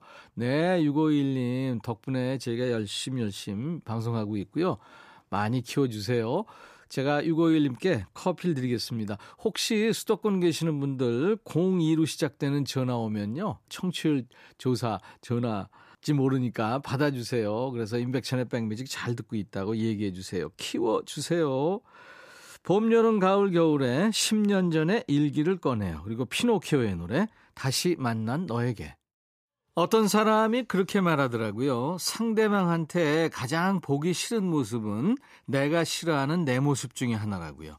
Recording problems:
none

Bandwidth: 14.5 kHz